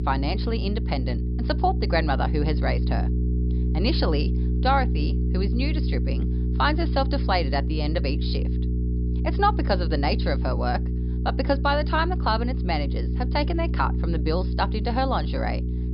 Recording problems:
high frequencies cut off; noticeable; nothing above 5.5 kHz
electrical hum; noticeable; throughout; 60 Hz, 10 dB below the speech

